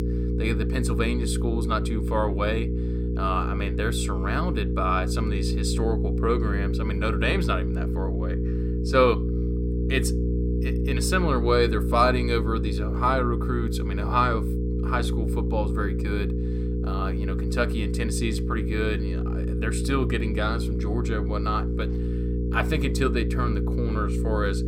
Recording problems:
electrical hum; loud; throughout; 60 Hz, 8 dB below the speech

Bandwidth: 16.5 kHz